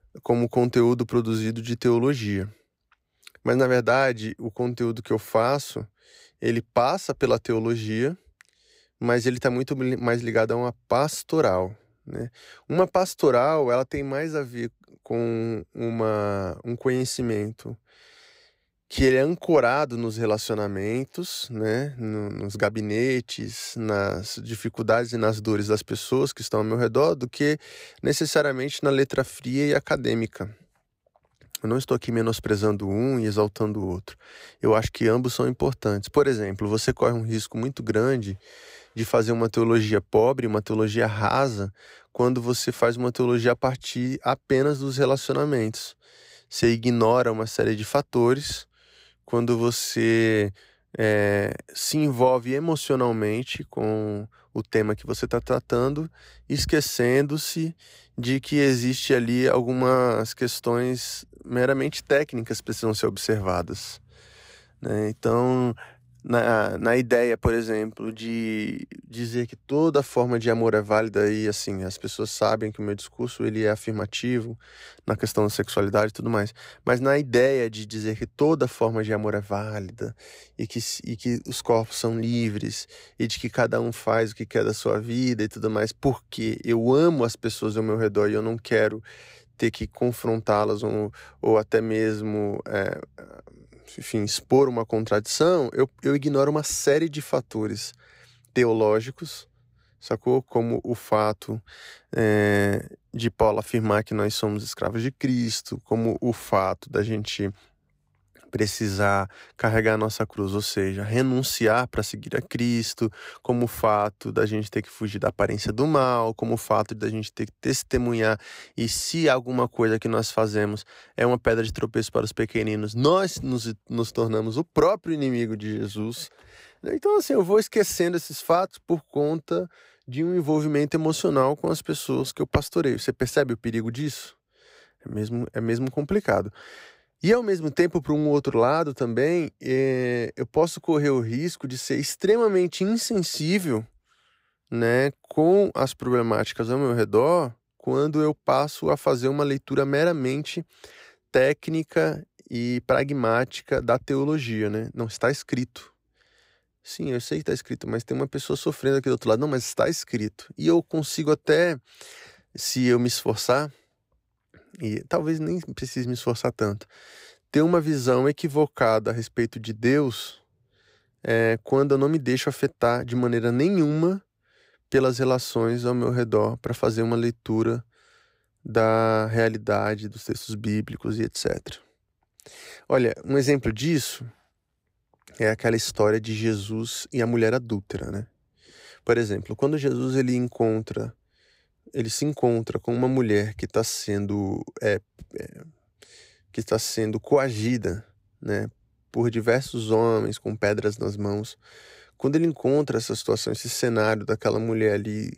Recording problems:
none

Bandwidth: 15.5 kHz